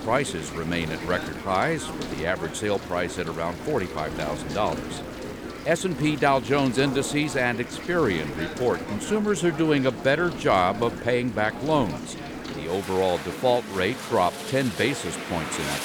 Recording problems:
rain or running water; noticeable; throughout; 10 dB below the speech
chatter from many people; noticeable; throughout; 15 dB below the speech

